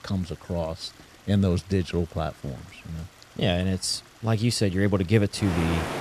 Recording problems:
rain or running water; noticeable; throughout; 15 dB below the speech

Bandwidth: 14 kHz